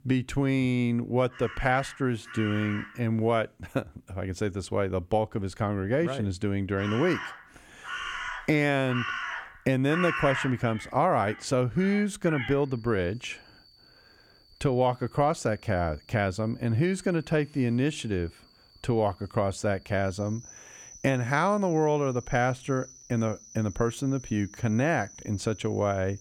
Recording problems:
animal sounds; noticeable; throughout; 10 dB below the speech

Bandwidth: 17.5 kHz